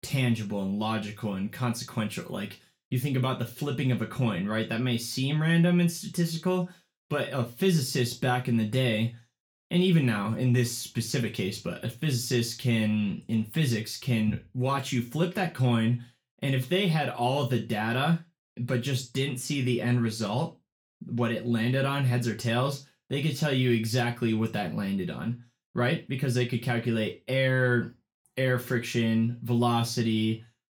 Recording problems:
room echo; very slight; dies away in 0.3 s
off-mic speech; somewhat distant

